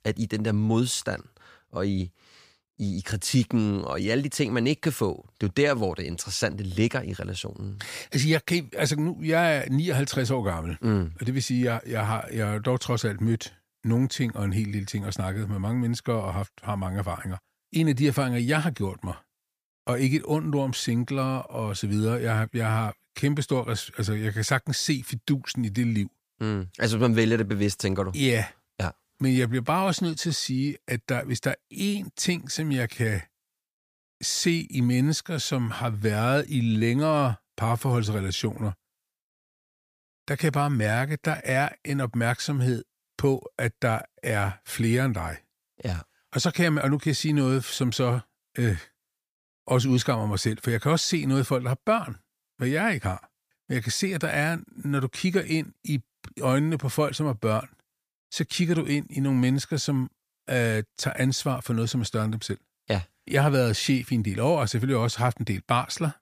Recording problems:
none

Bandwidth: 15 kHz